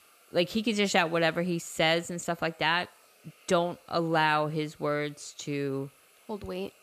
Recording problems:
hiss; faint; throughout; 30 dB below the speech

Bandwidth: 14.5 kHz